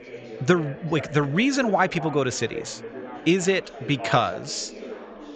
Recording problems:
high frequencies cut off; noticeable; nothing above 8 kHz
chatter from many people; noticeable; throughout; 15 dB below the speech

